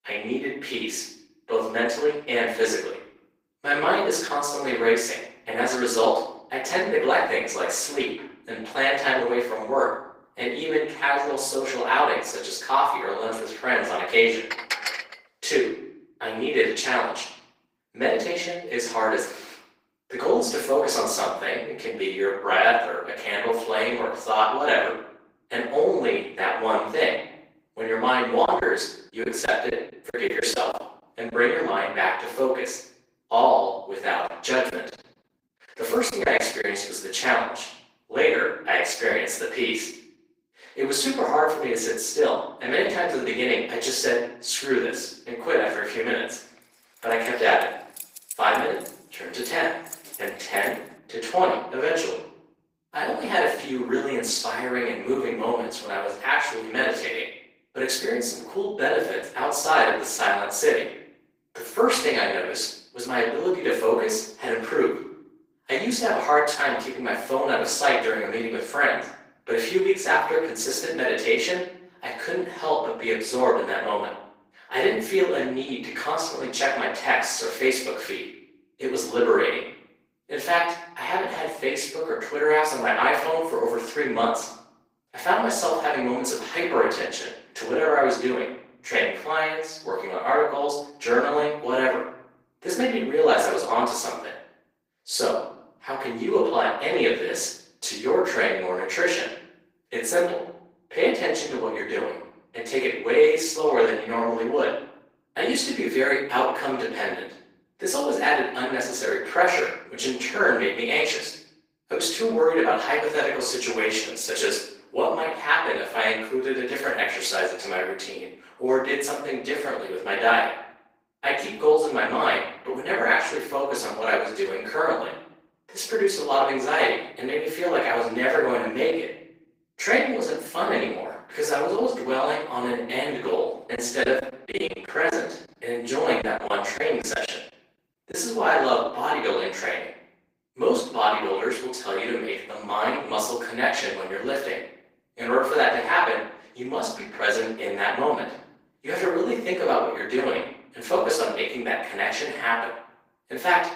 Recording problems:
off-mic speech; far
thin; very; fading below 350 Hz
room echo; noticeable; dies away in 0.7 s
garbled, watery; slightly; nothing above 15.5 kHz
clattering dishes; noticeable; at 15 s; peak 2 dB below the speech
choppy; very; from 28 to 31 s, from 35 to 37 s and from 2:14 to 2:18; 10% of the speech affected
jangling keys; faint; from 47 to 51 s; peak 10 dB below the speech

